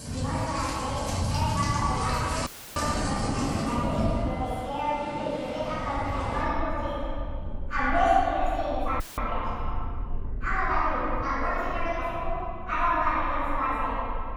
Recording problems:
room echo; strong; dies away in 2.1 s
off-mic speech; far
wrong speed and pitch; too fast and too high; 1.6 times normal speed
rain or running water; loud; throughout; 5 dB below the speech
audio cutting out; filled with static; at 2.5 s and at 9 s

